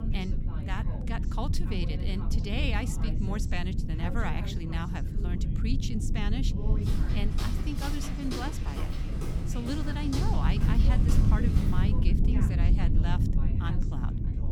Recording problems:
background chatter; loud; throughout; 2 voices, 10 dB below the speech
low rumble; loud; throughout; 4 dB below the speech
footsteps; noticeable; from 7 to 12 s; peak 2 dB below the speech

